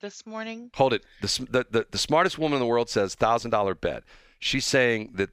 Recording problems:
none

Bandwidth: 15 kHz